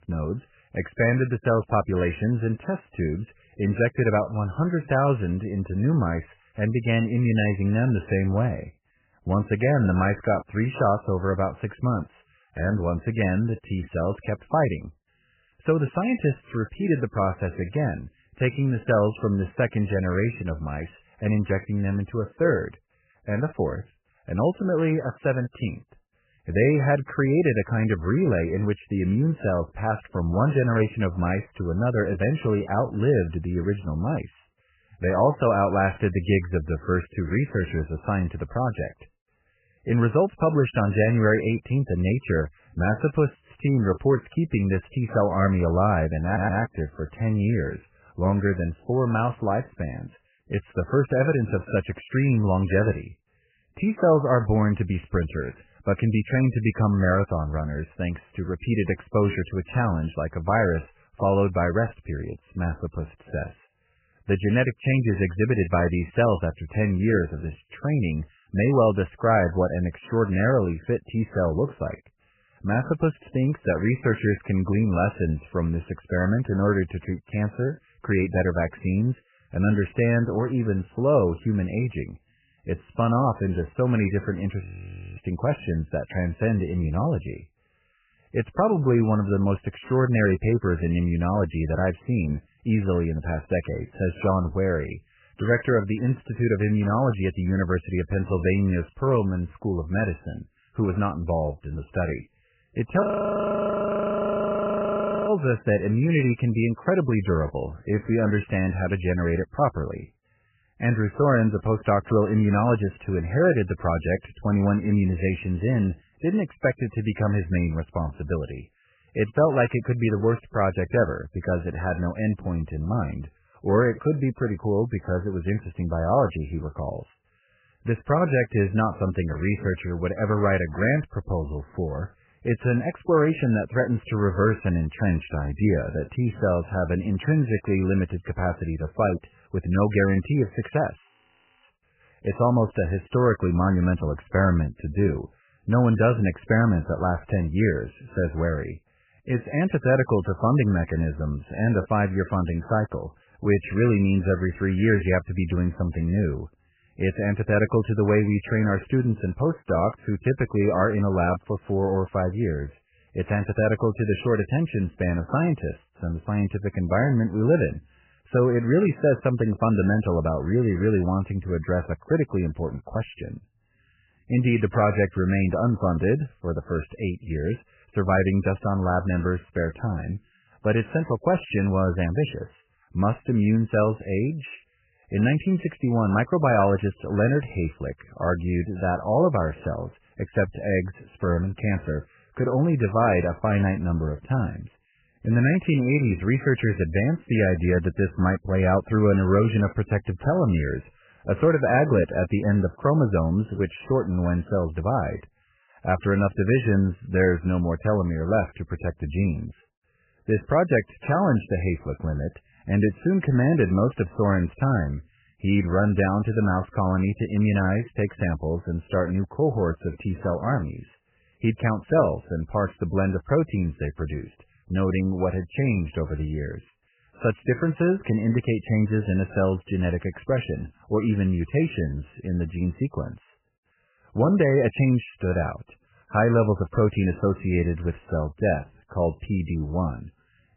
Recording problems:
garbled, watery; badly; nothing above 3 kHz
audio stuttering; at 46 s
audio freezing; at 1:25 for 0.5 s, at 1:43 for 2.5 s and at 2:21 for 0.5 s

